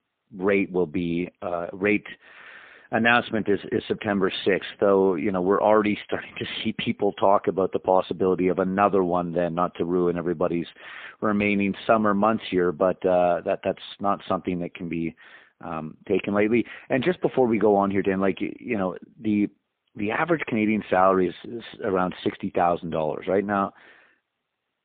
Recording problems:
phone-call audio; poor line; nothing above 3.5 kHz

